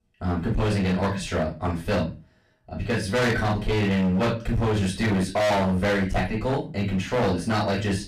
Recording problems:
distortion; heavy; 22% of the sound clipped
off-mic speech; far
room echo; slight; dies away in 0.3 s

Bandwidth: 14.5 kHz